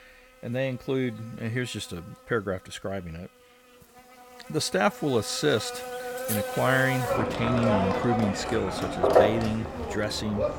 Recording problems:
animal sounds; very loud; throughout; as loud as the speech

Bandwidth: 17 kHz